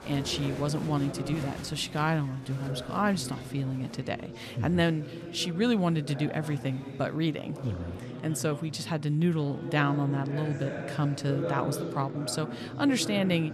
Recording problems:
chatter from many people; loud; throughout; 9 dB below the speech

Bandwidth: 14 kHz